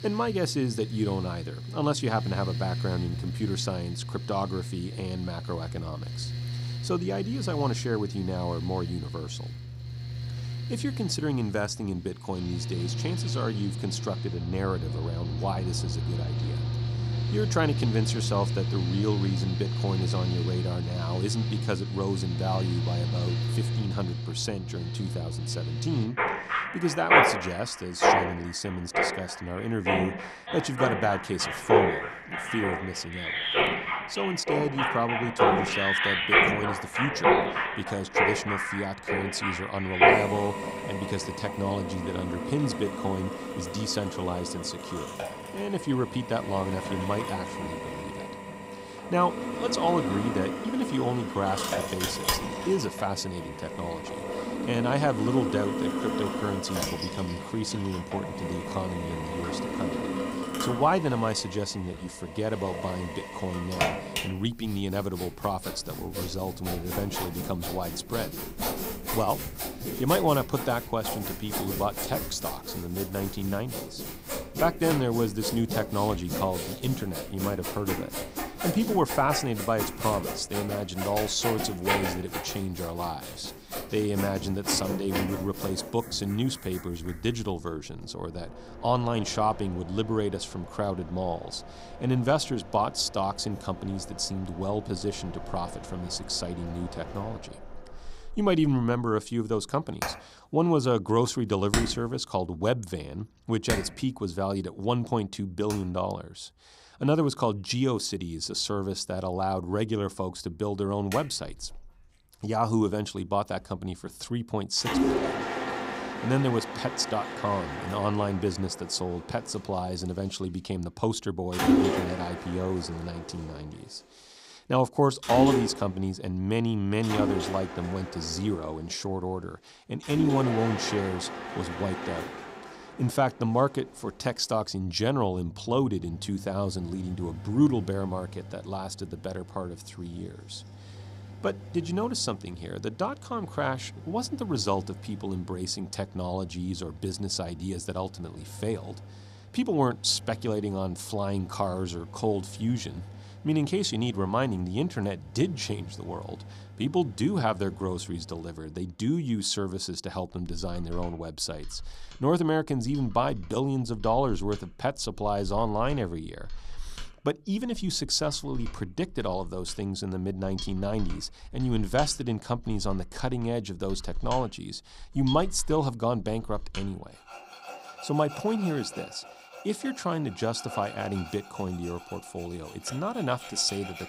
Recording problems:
machinery noise; loud; throughout; 1 dB below the speech

